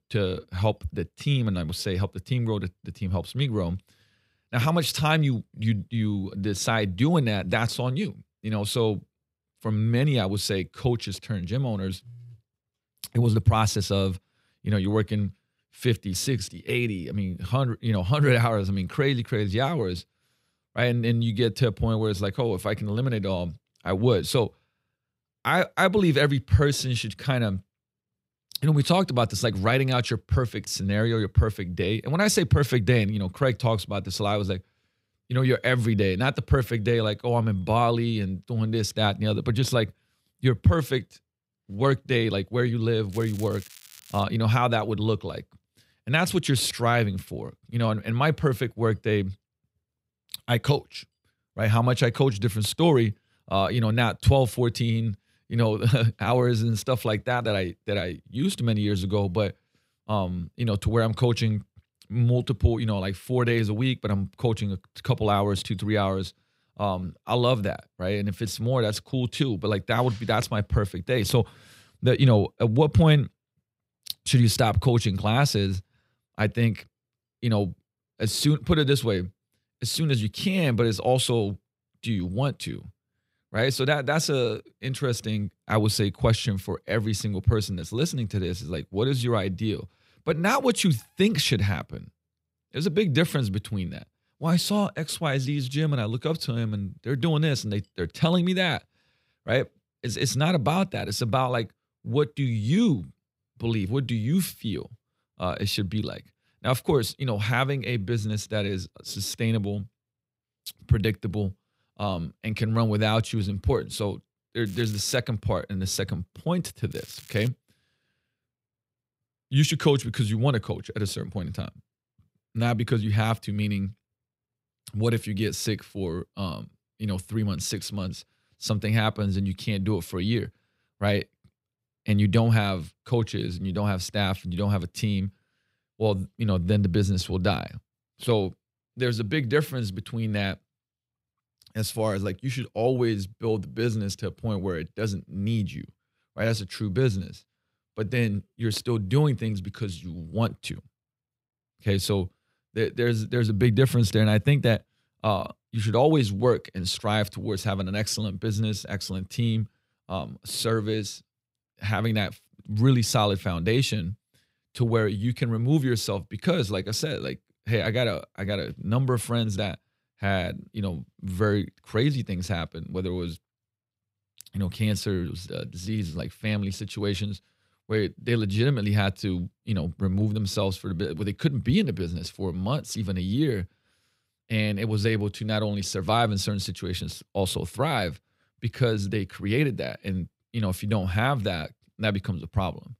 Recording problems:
crackling; faint; from 43 to 44 s, at 1:55 and at 1:57; 20 dB below the speech

